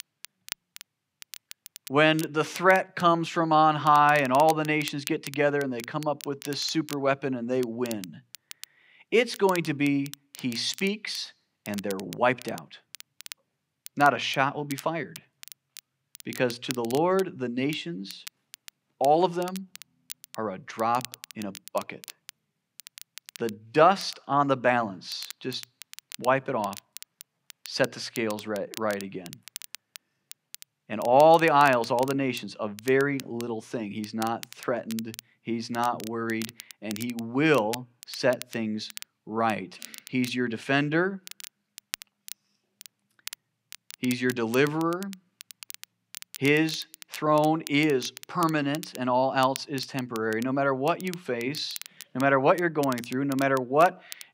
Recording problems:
crackle, like an old record; noticeable; 15 dB below the speech

